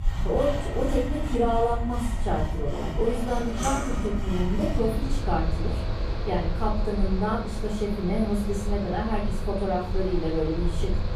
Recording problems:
off-mic speech; far
room echo; noticeable; dies away in 0.5 s
machinery noise; loud; throughout; 9 dB below the speech
low rumble; faint; throughout; 20 dB below the speech

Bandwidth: 14.5 kHz